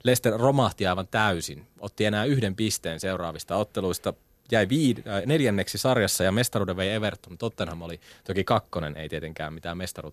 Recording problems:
none

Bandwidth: 14.5 kHz